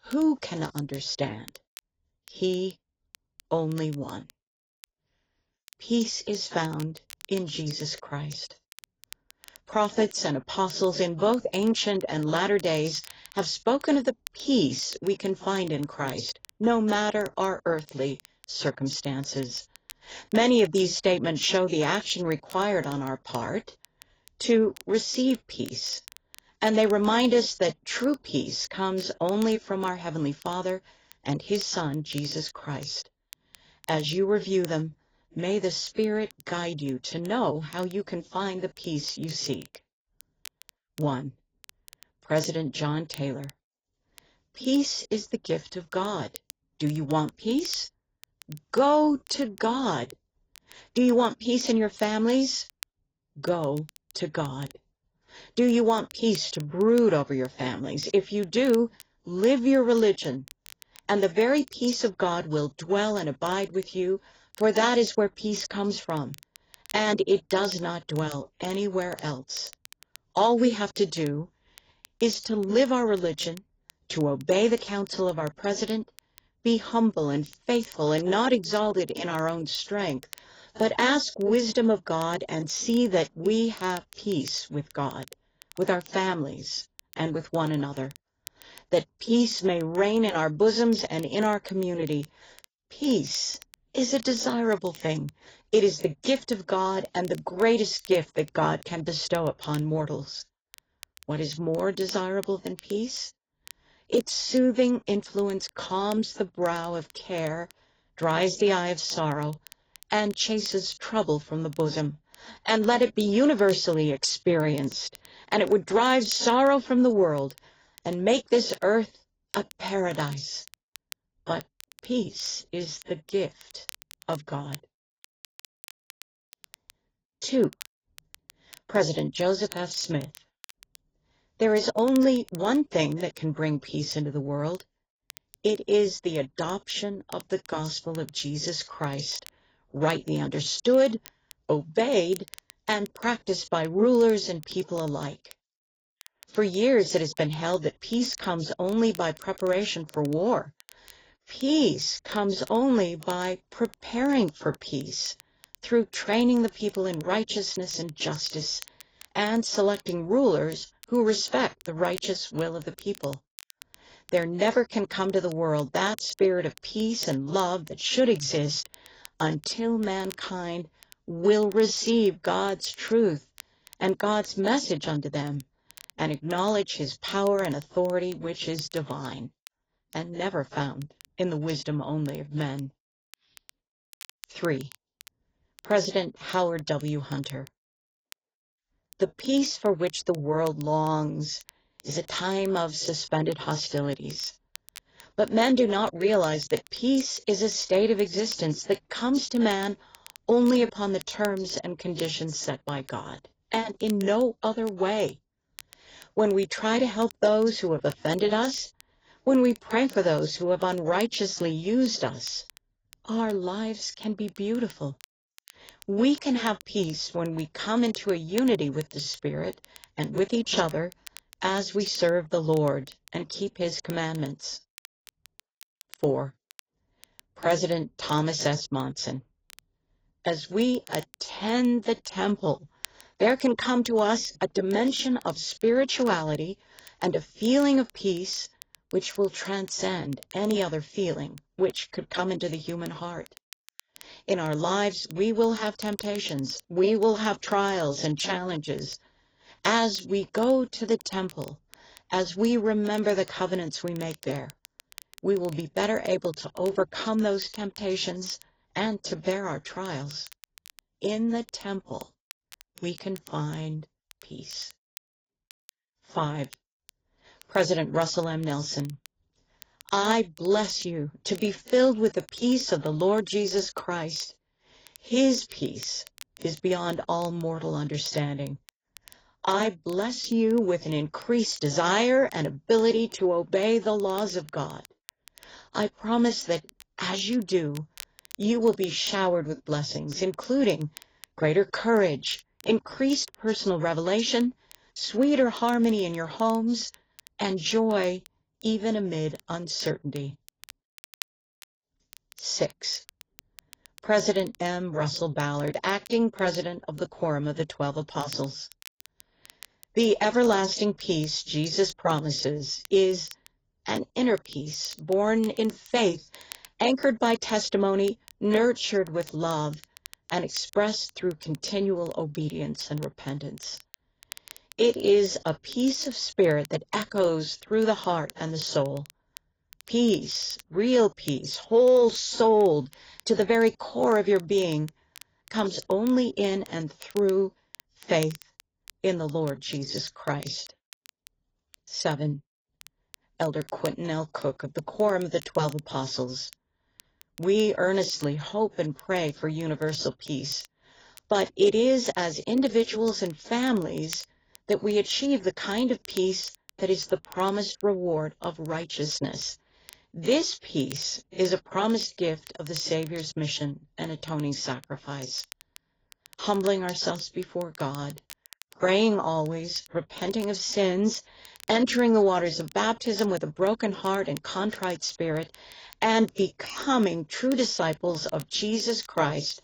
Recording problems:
garbled, watery; badly; nothing above 7.5 kHz
crackle, like an old record; faint; 25 dB below the speech

